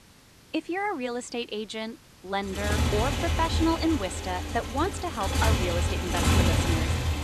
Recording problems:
traffic noise; very loud; from 2.5 s on; 3 dB above the speech
hiss; faint; throughout; 20 dB below the speech

